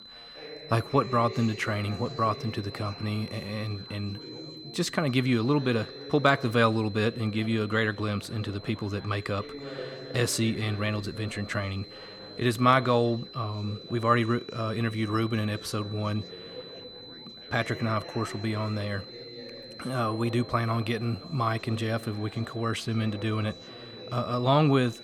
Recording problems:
high-pitched whine; noticeable; throughout; 4 kHz, 15 dB below the speech
background chatter; noticeable; throughout; 4 voices, 15 dB below the speech

